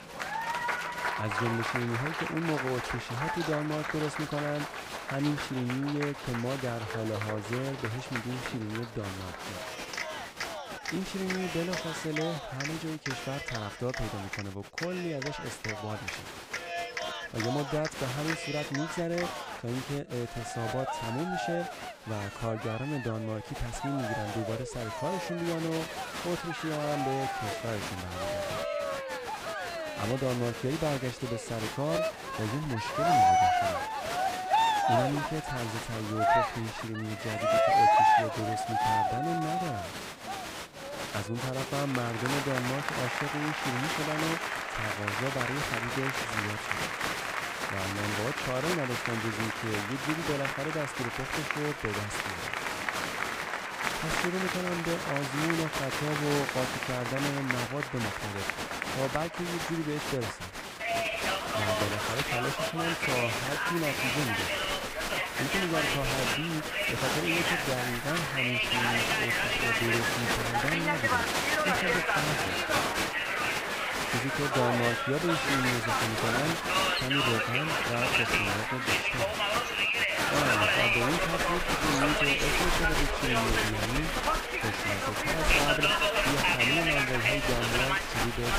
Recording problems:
crowd noise; very loud; throughout; 5 dB above the speech

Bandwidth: 15.5 kHz